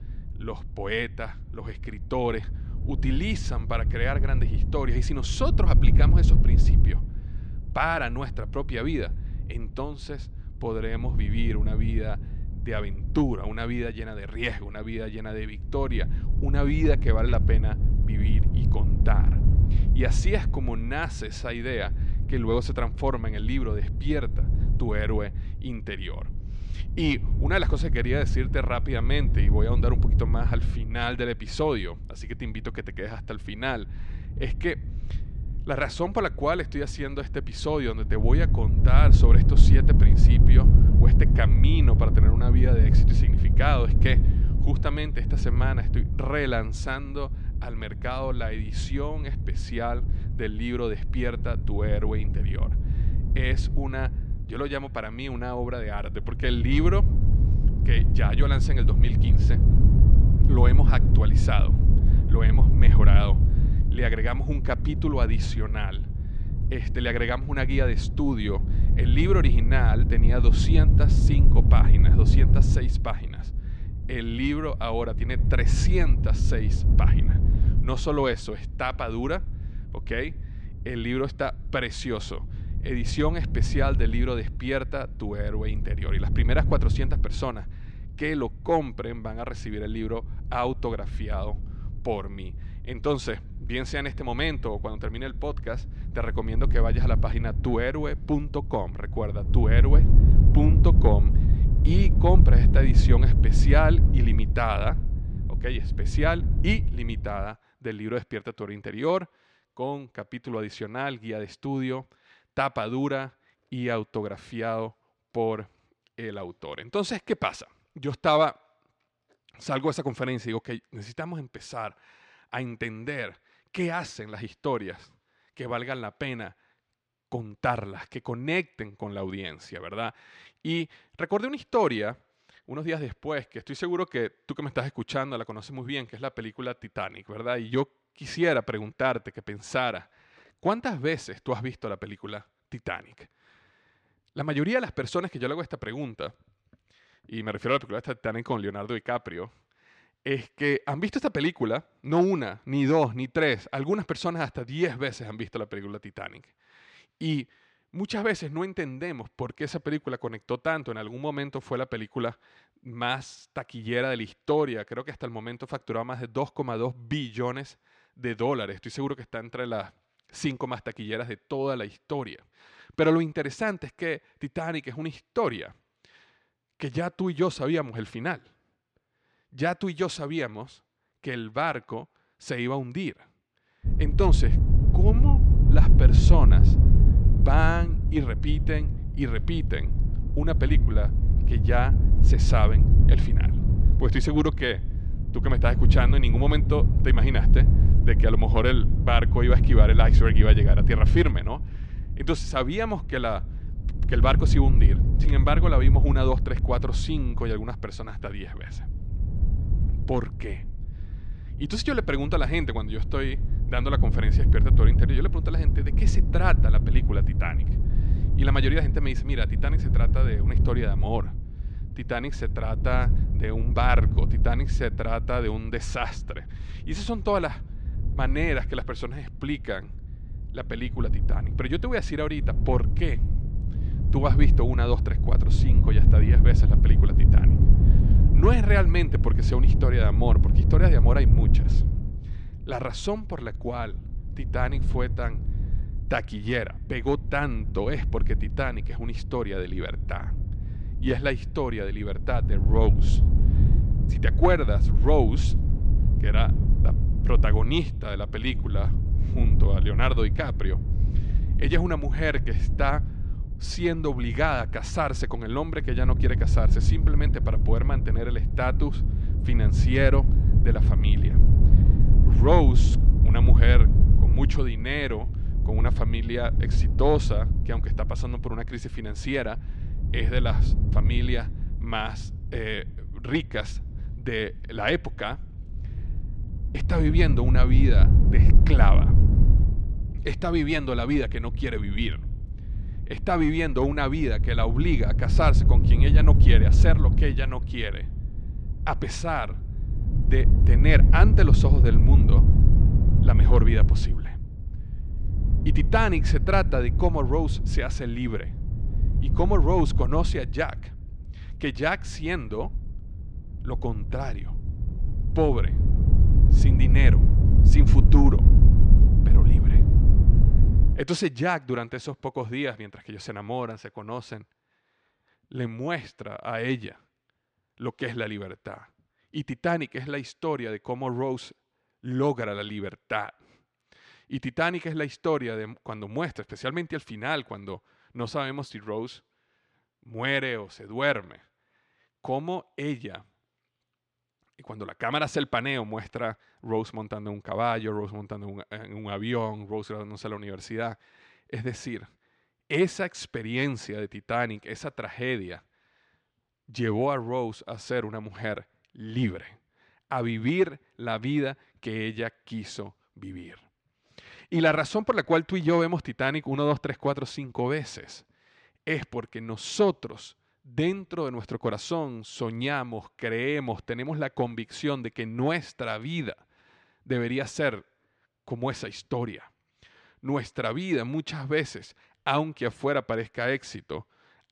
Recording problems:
wind noise on the microphone; heavy; until 1:47 and from 3:04 to 5:21; 8 dB below the speech

